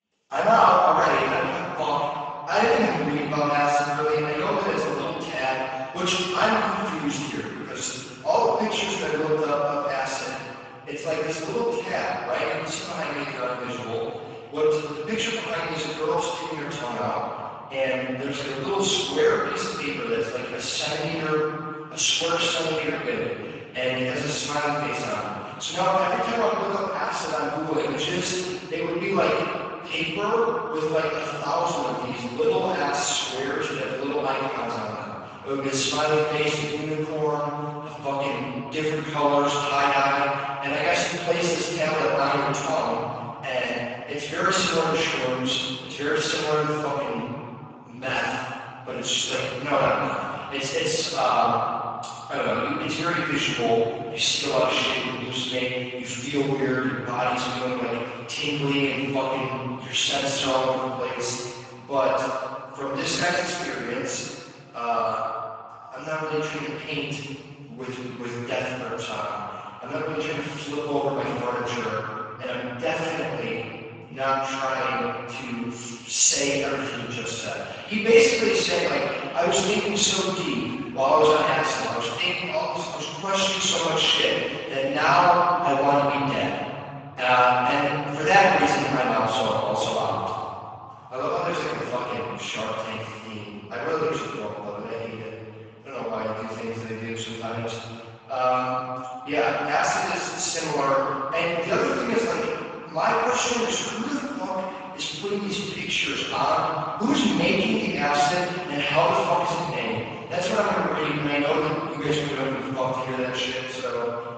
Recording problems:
room echo; strong; dies away in 2.6 s
off-mic speech; far
garbled, watery; badly; nothing above 7.5 kHz
thin; very slightly; fading below 450 Hz

